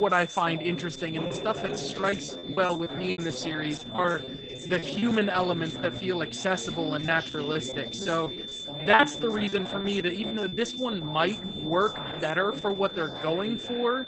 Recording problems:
garbled, watery; badly; nothing above 8 kHz
high-pitched whine; loud; throughout; 3.5 kHz, 8 dB below the speech
background chatter; noticeable; throughout; 2 voices, 10 dB below the speech
abrupt cut into speech; at the start
choppy; very; from 1.5 to 5.5 s and from 7 to 11 s; 17% of the speech affected

